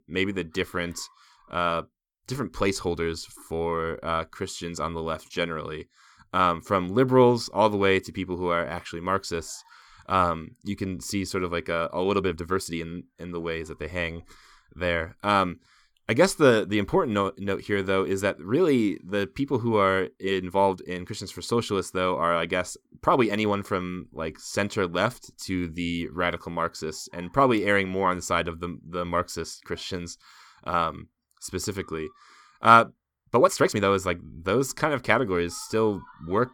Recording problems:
uneven, jittery; strongly; from 3.5 to 34 s

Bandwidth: 18.5 kHz